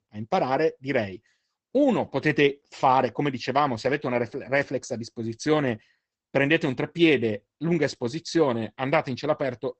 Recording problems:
garbled, watery; badly; nothing above 8 kHz

